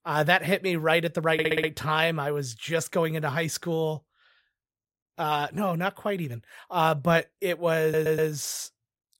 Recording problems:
audio stuttering; at 1.5 s and at 8 s

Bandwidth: 16 kHz